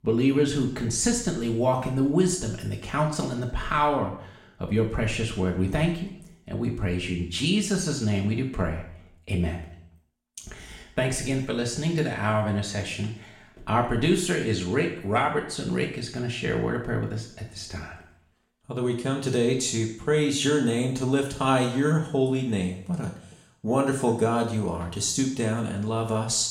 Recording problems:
room echo; slight; dies away in 0.7 s
off-mic speech; somewhat distant

